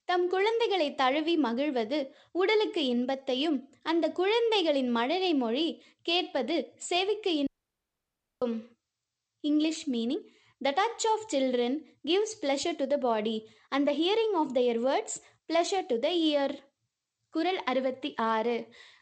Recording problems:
garbled, watery; slightly; nothing above 8 kHz
audio cutting out; at 7.5 s for 1 s

